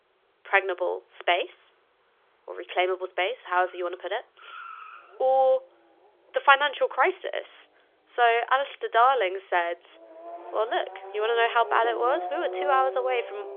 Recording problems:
phone-call audio; nothing above 3.5 kHz
traffic noise; noticeable; throughout; 10 dB below the speech

